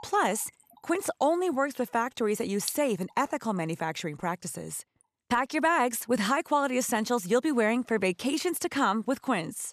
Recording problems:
rain or running water; noticeable; throughout; 20 dB below the speech

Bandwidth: 14 kHz